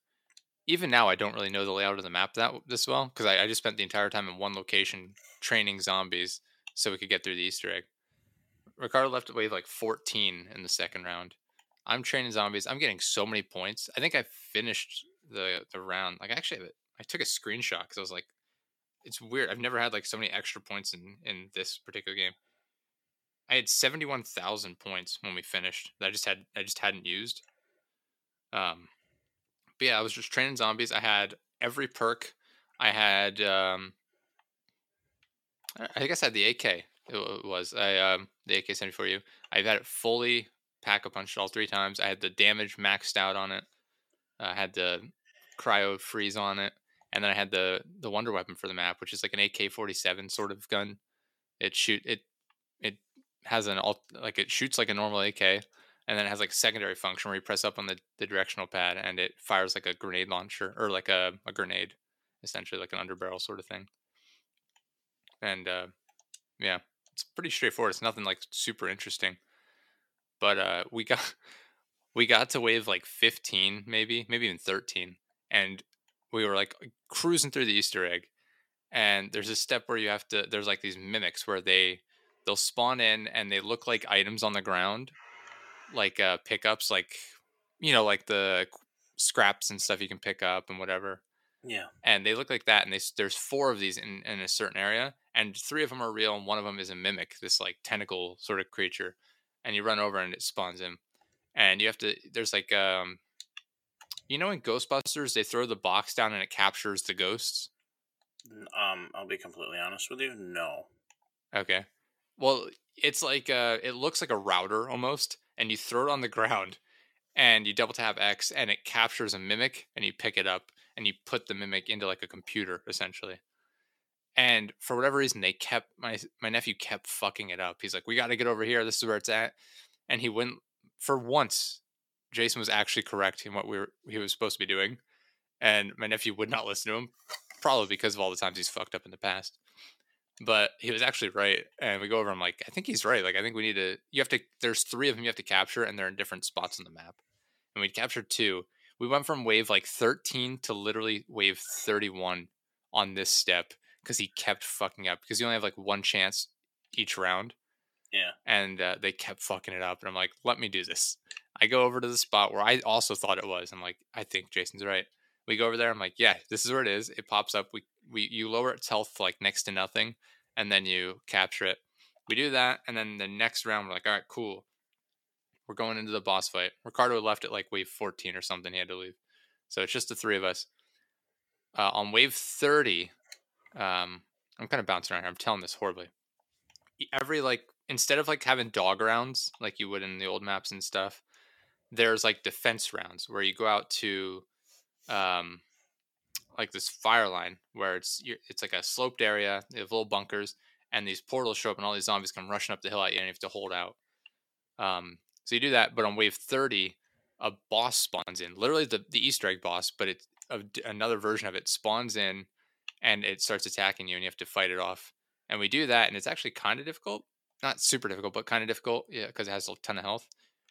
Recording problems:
thin; somewhat; fading below 350 Hz

